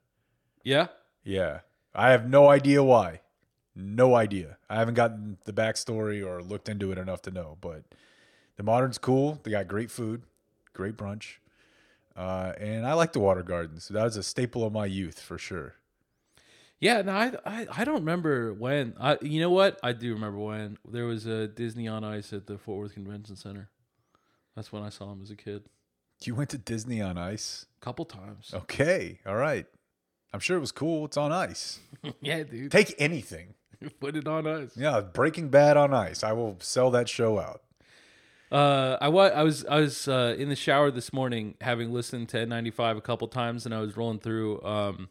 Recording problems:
none

